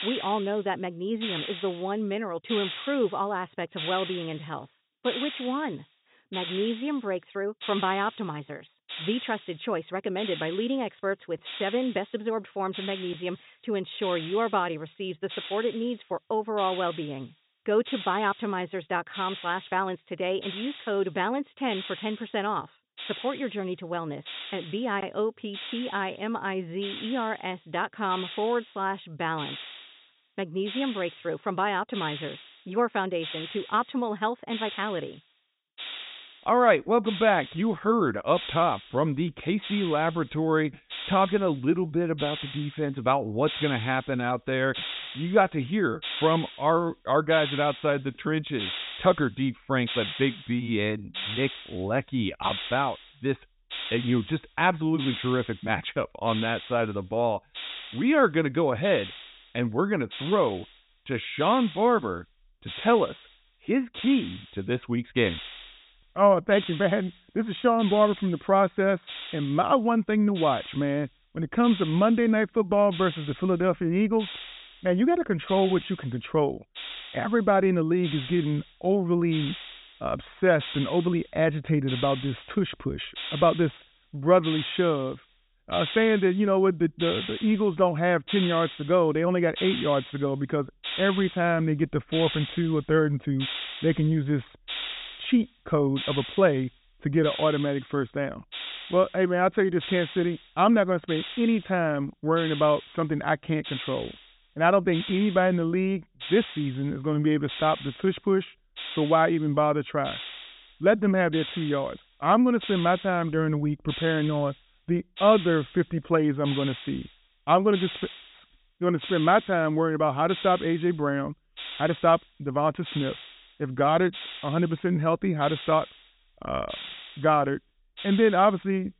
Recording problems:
high frequencies cut off; severe; nothing above 4 kHz
hiss; noticeable; throughout; 10 dB below the speech

